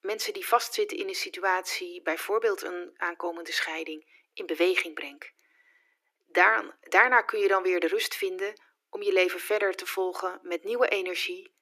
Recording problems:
thin; very; fading below 300 Hz

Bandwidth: 14.5 kHz